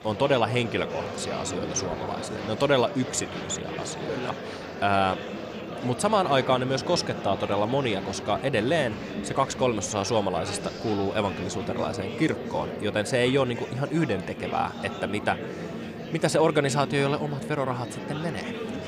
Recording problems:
murmuring crowd; loud; throughout; 8 dB below the speech

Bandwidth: 14 kHz